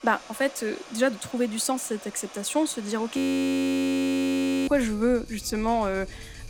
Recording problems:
rain or running water; noticeable; throughout; 15 dB below the speech
audio freezing; at 3 s for 1.5 s

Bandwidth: 17 kHz